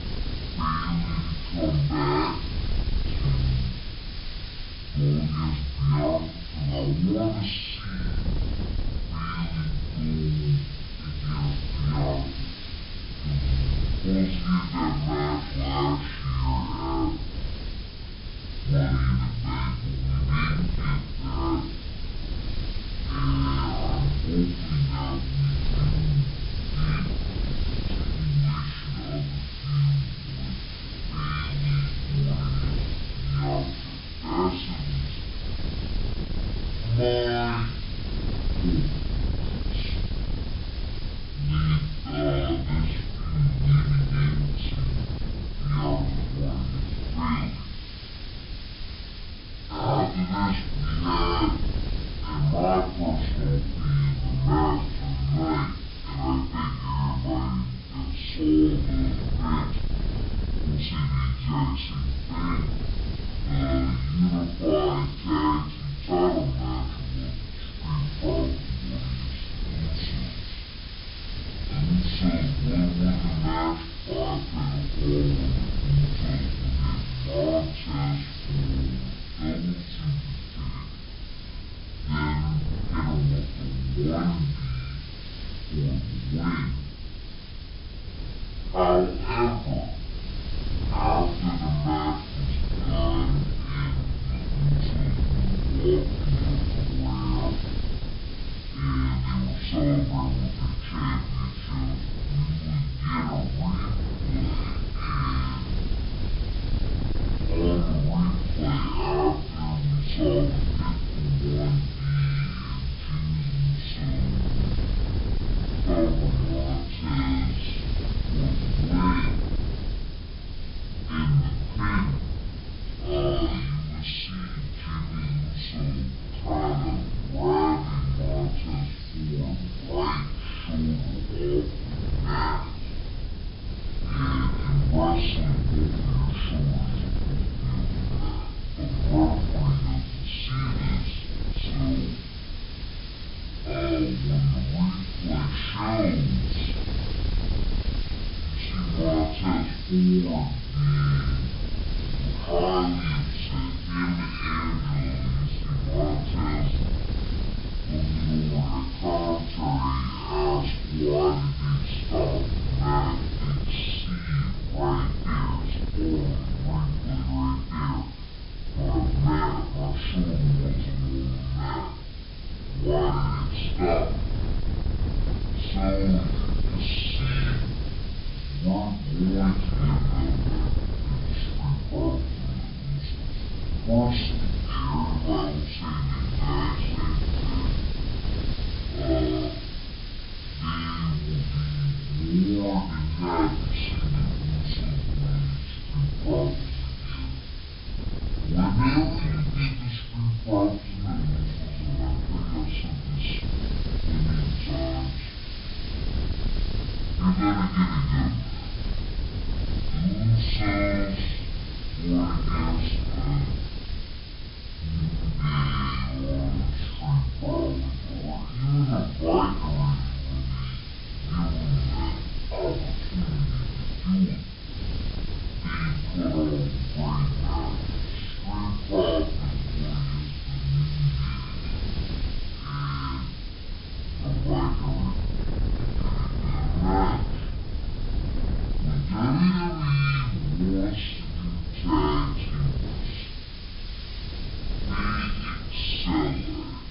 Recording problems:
off-mic speech; far
wrong speed and pitch; too slow and too low; 0.5 times normal speed
high frequencies cut off; noticeable; nothing above 5.5 kHz
room echo; slight; dies away in 0.3 s
wind noise on the microphone; occasional gusts; 15 dB below the speech
hiss; noticeable; throughout; 15 dB below the speech

